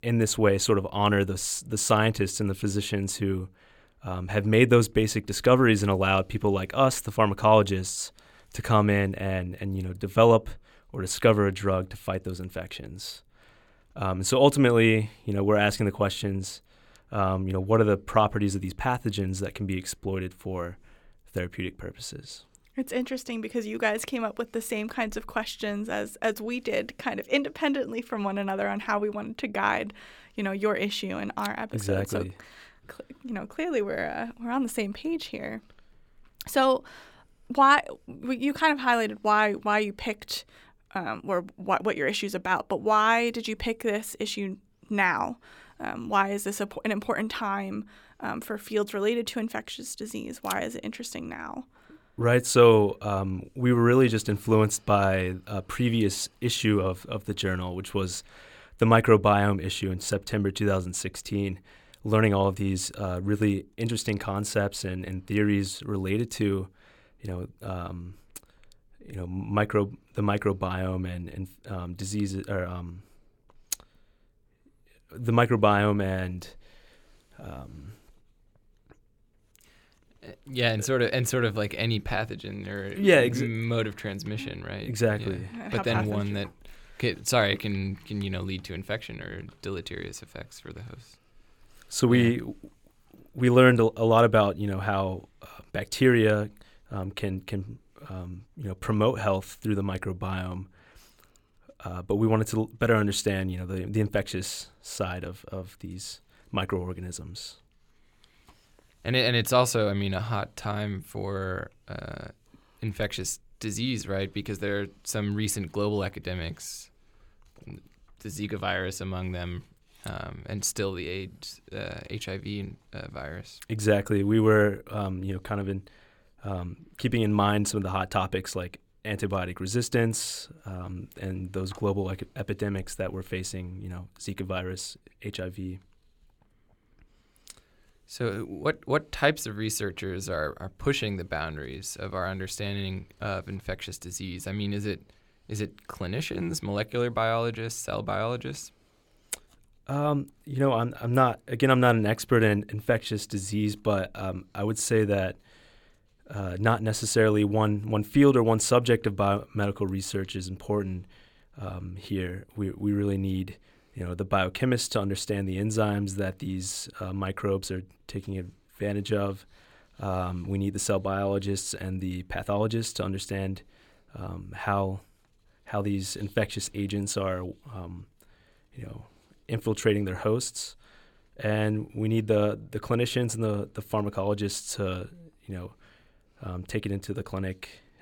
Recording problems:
none

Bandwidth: 17 kHz